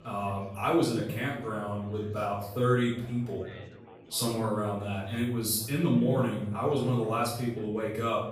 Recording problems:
off-mic speech; far
room echo; noticeable; dies away in 0.7 s
chatter from many people; faint; throughout; 20 dB below the speech

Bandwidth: 15 kHz